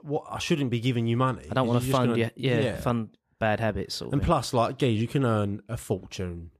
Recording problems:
none

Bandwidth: 14.5 kHz